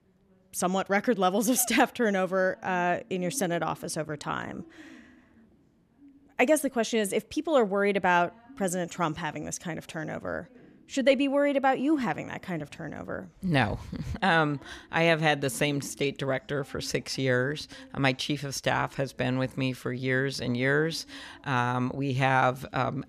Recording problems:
voice in the background; faint; throughout; 25 dB below the speech

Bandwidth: 14.5 kHz